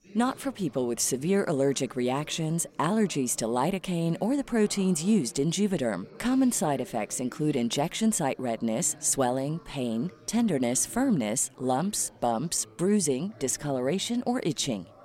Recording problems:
chatter from many people; faint; throughout; 25 dB below the speech

